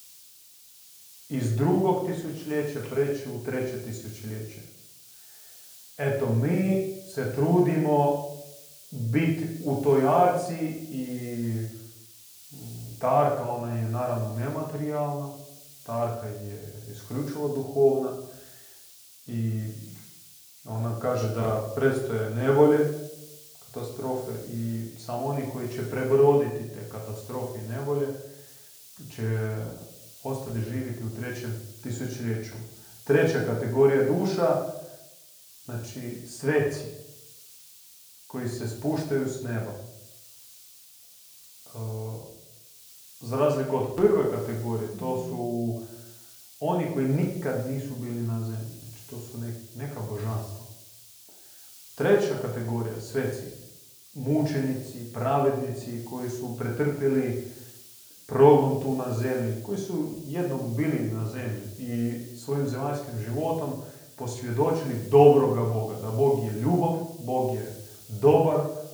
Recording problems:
off-mic speech; far
room echo; slight; dies away in 0.6 s
hiss; noticeable; throughout; 20 dB below the speech

